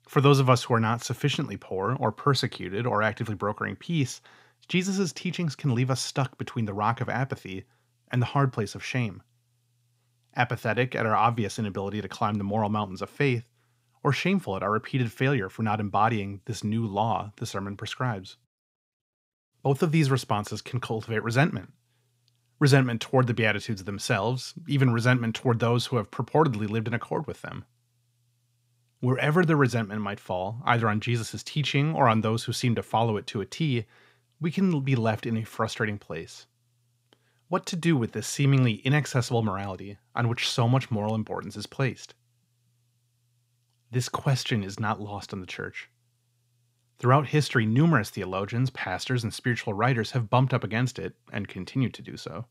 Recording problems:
none

